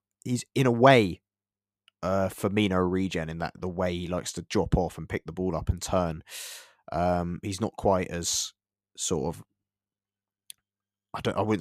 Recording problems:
abrupt cut into speech; at the end

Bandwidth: 14.5 kHz